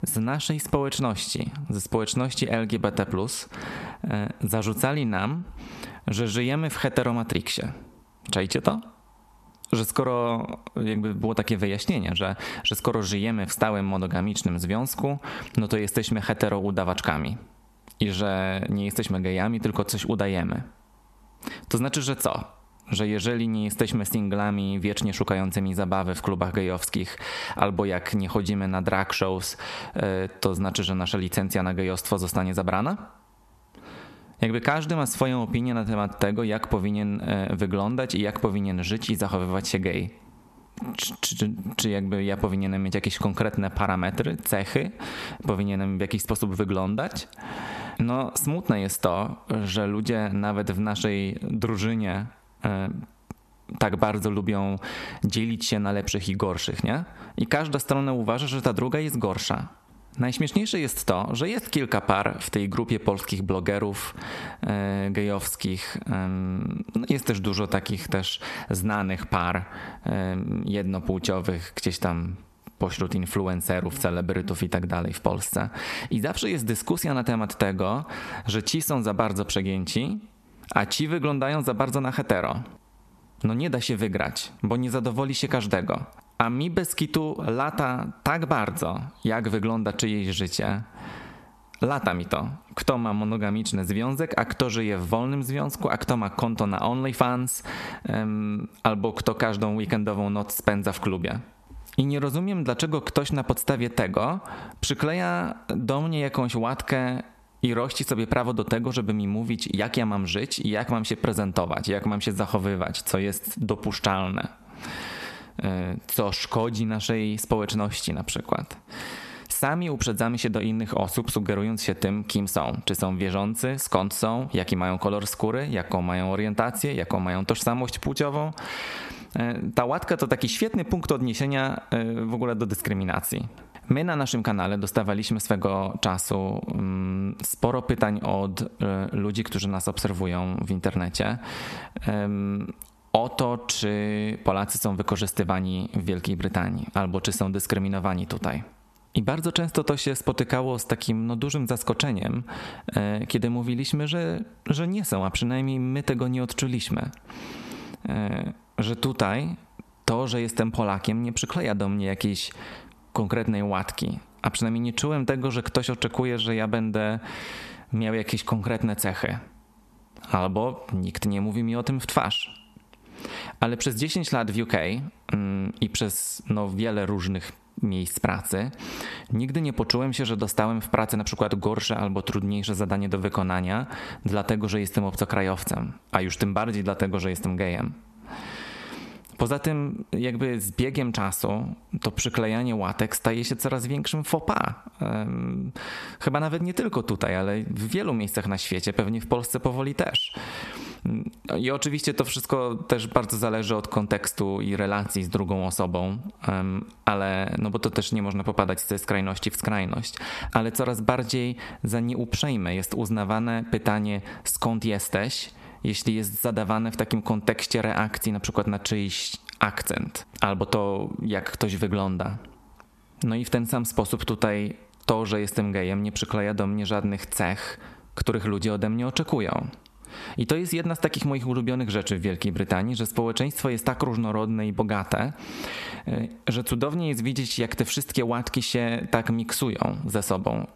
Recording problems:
squashed, flat; heavily

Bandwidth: 13.5 kHz